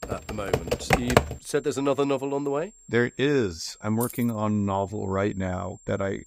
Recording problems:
high-pitched whine; faint; throughout; 7.5 kHz, 25 dB below the speech
keyboard typing; loud; until 1.5 s; peak 6 dB above the speech
jangling keys; noticeable; at 4 s; peak 8 dB below the speech

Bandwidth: 15.5 kHz